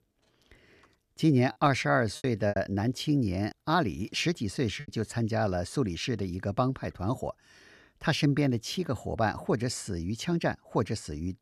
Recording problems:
choppy; very; from 2 to 5 s; 7% of the speech affected

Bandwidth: 14.5 kHz